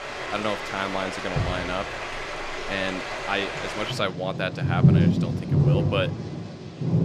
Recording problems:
rain or running water; very loud; throughout; 4 dB above the speech

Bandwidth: 15 kHz